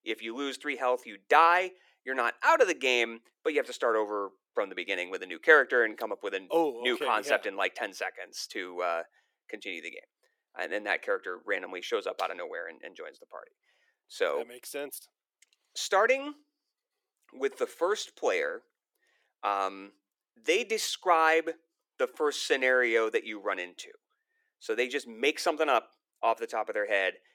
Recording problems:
thin; somewhat; fading below 350 Hz

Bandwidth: 17 kHz